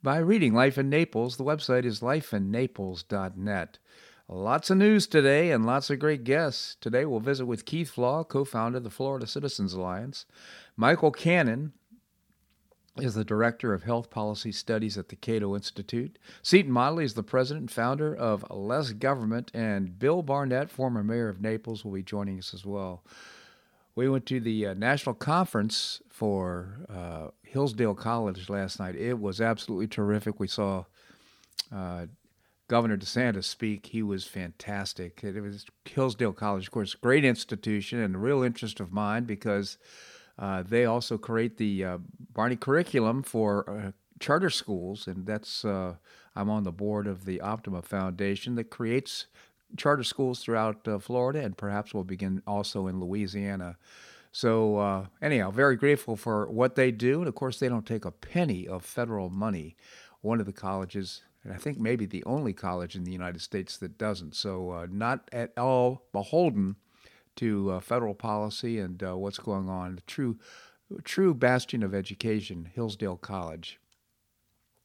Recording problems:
none

